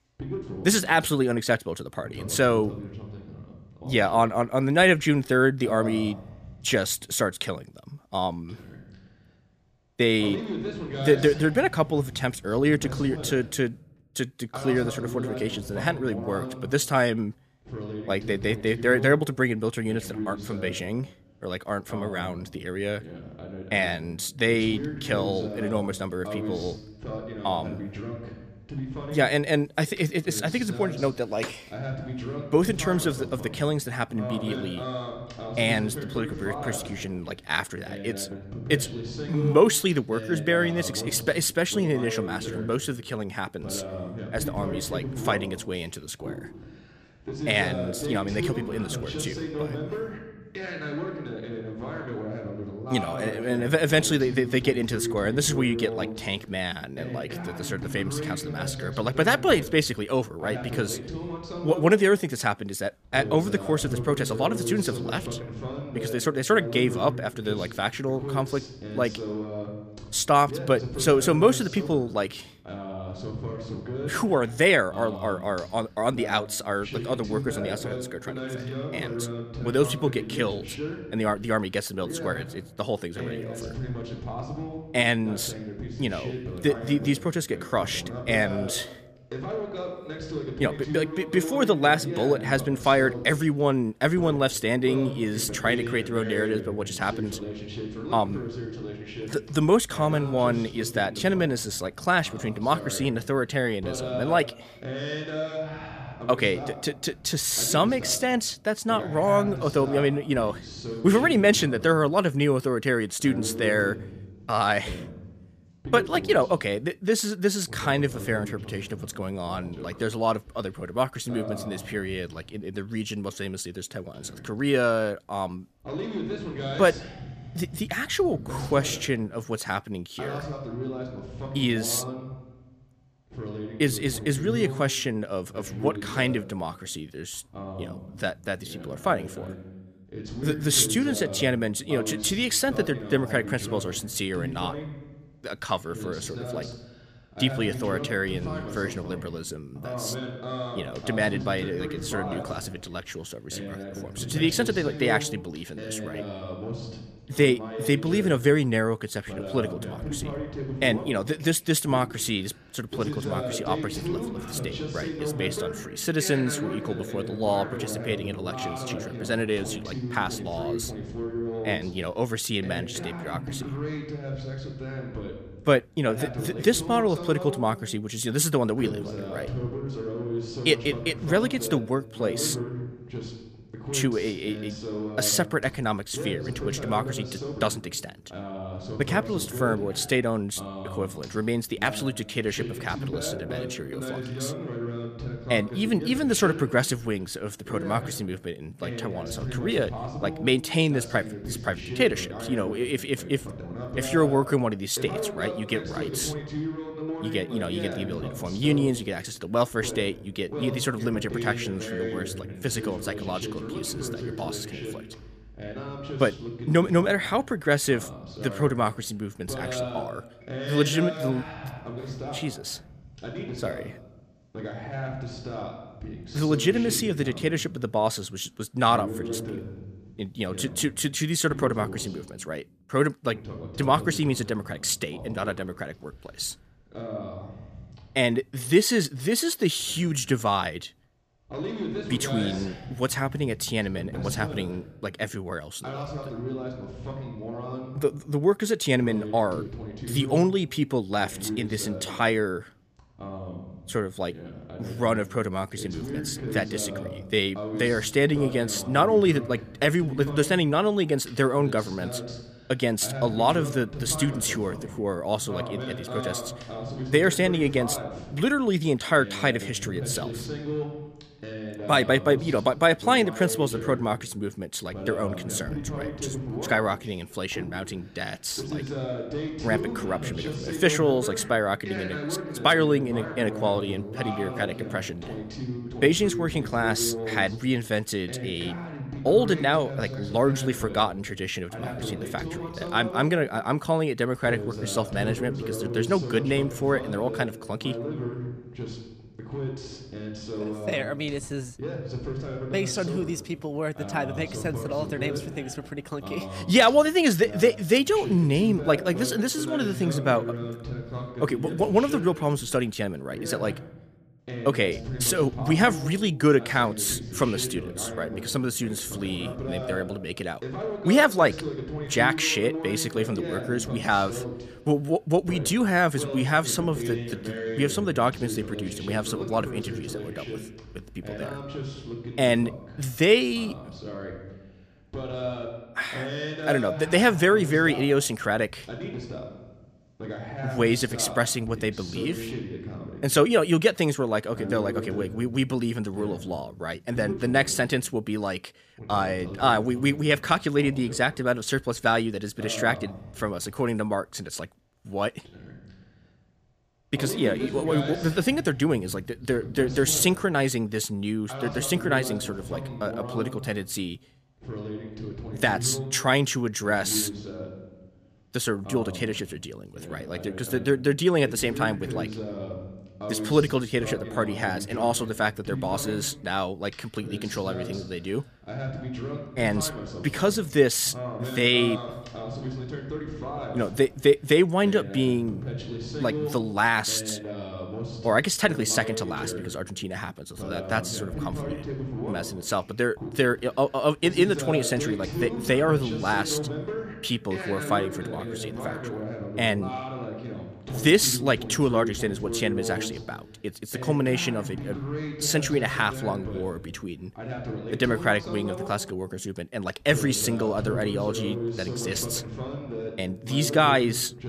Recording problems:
voice in the background; loud; throughout; 9 dB below the speech

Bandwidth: 14.5 kHz